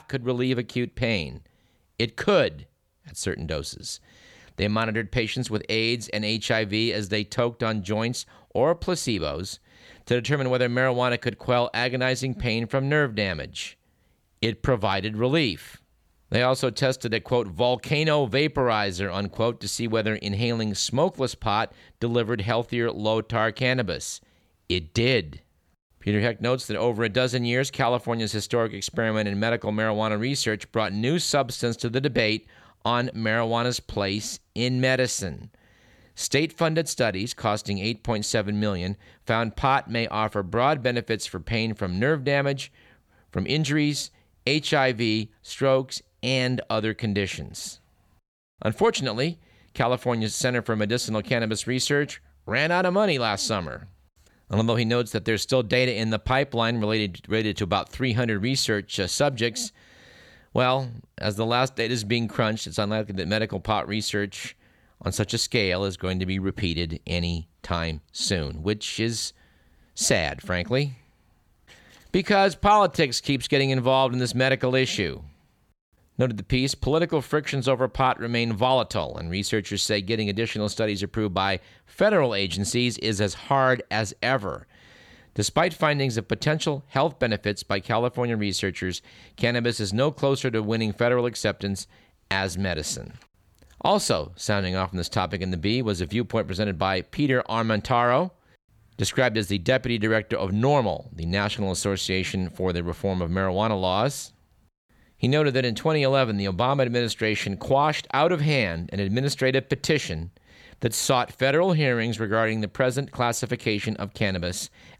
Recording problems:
none

